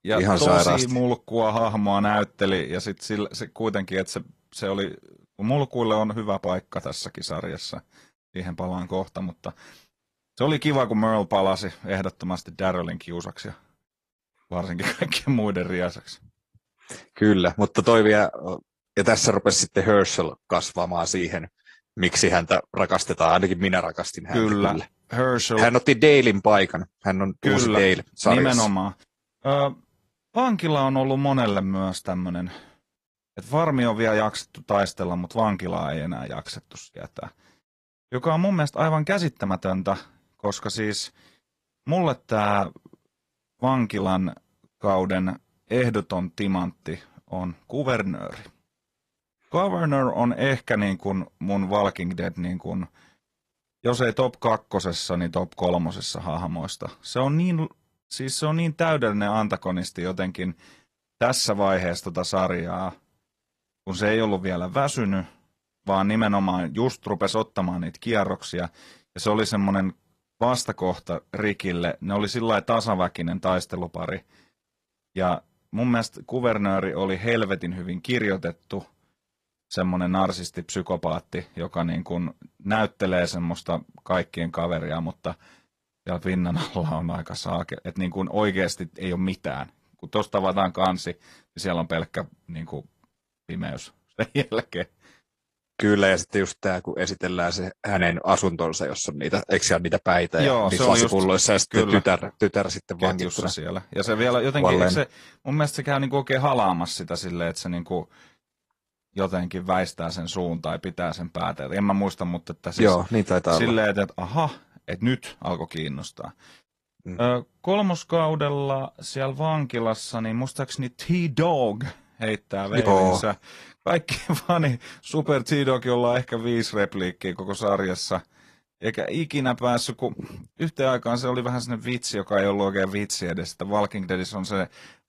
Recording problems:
garbled, watery; slightly

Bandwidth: 15 kHz